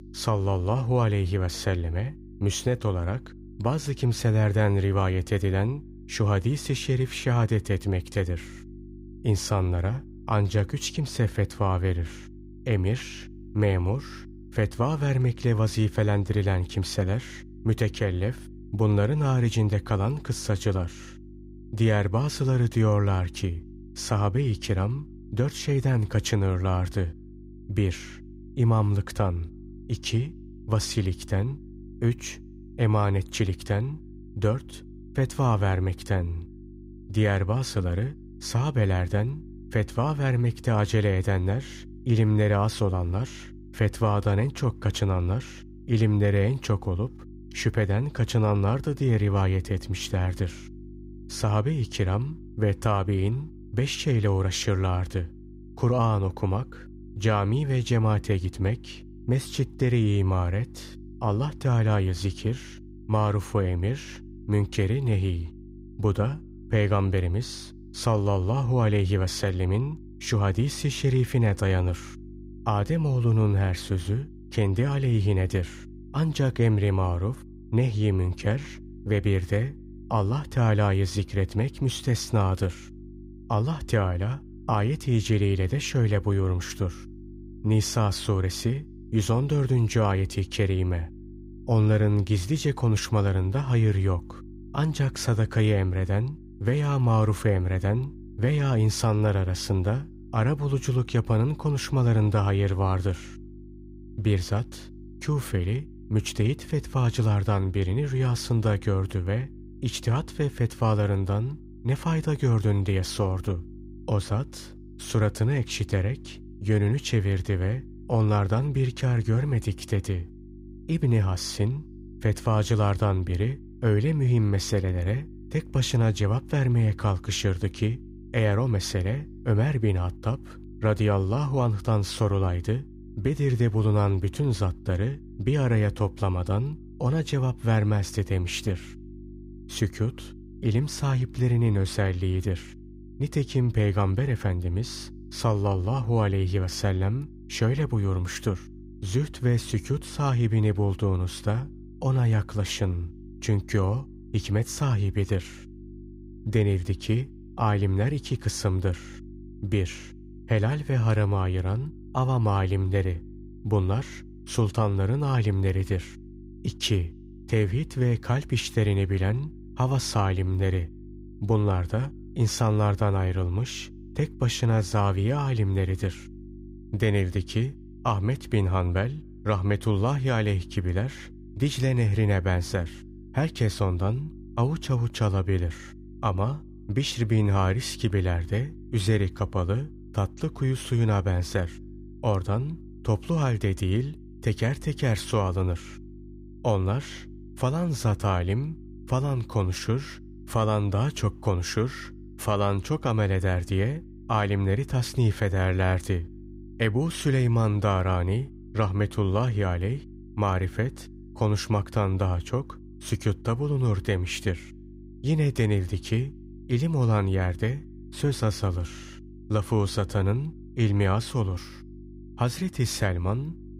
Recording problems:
electrical hum; faint; throughout; 50 Hz, 20 dB below the speech

